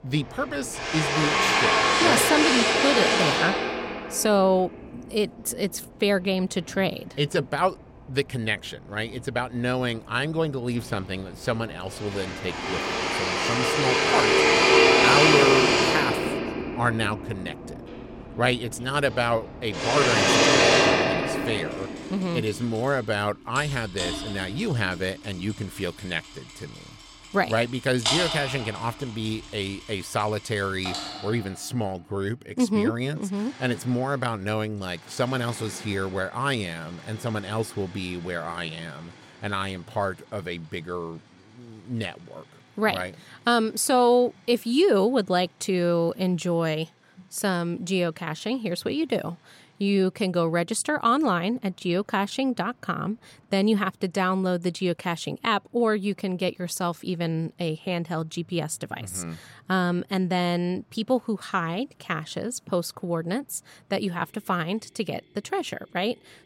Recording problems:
machinery noise; very loud; throughout; 5 dB above the speech

